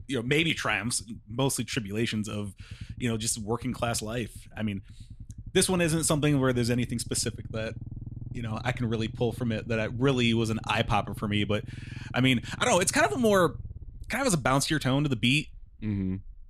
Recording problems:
low rumble; faint; throughout; 25 dB below the speech

